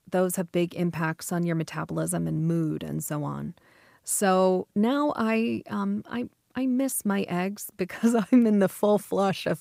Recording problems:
none

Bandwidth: 15.5 kHz